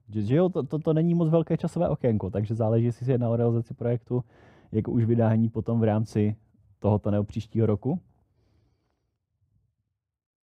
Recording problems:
muffled; very; fading above 1.5 kHz

